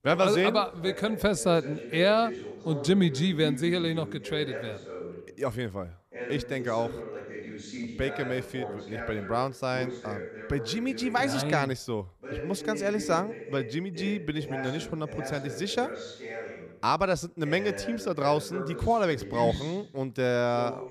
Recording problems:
voice in the background; loud; throughout; 10 dB below the speech

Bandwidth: 14.5 kHz